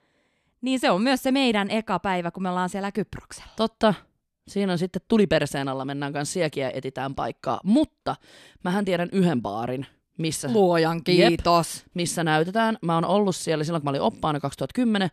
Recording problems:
none

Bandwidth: 13.5 kHz